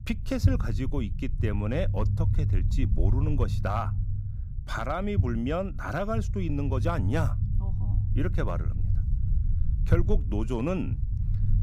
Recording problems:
low rumble; noticeable; throughout; 10 dB below the speech

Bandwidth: 15.5 kHz